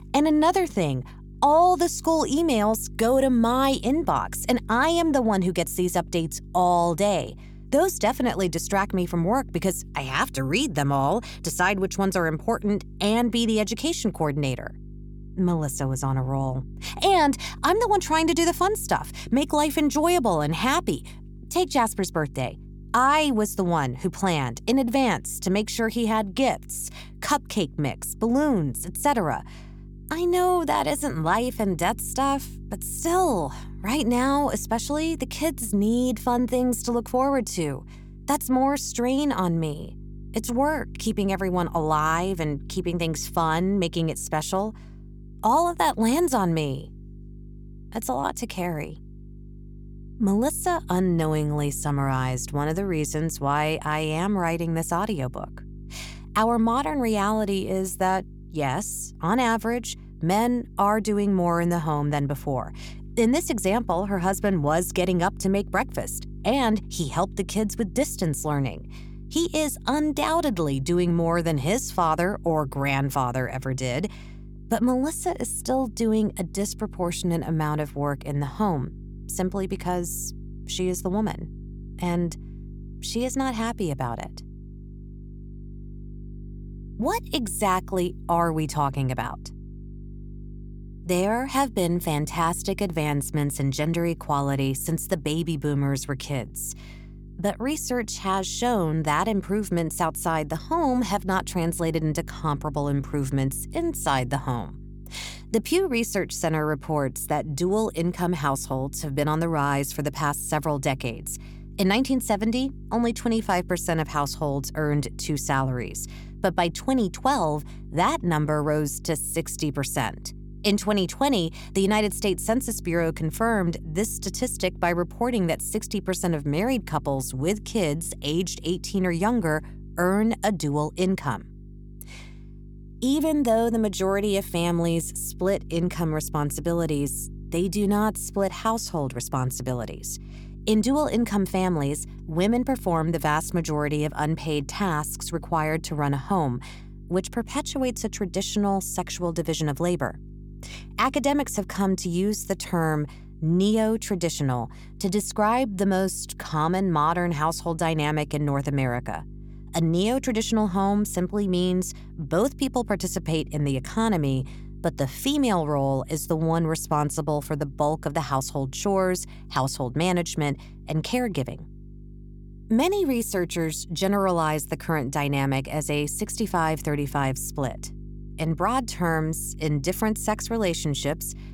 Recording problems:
electrical hum; faint; throughout; 50 Hz, 25 dB below the speech

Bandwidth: 18.5 kHz